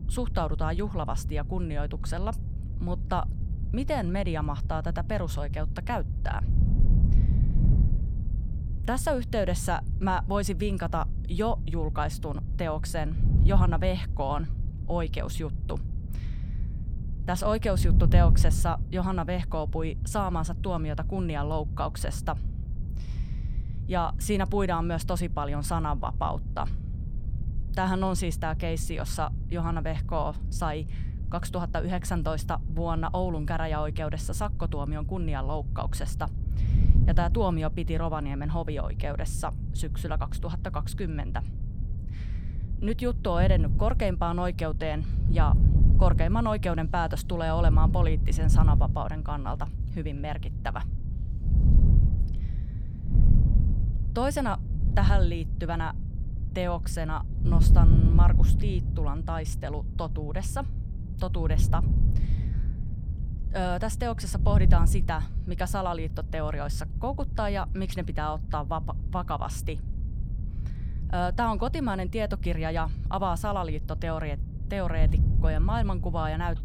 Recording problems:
wind noise on the microphone; occasional gusts; 10 dB below the speech

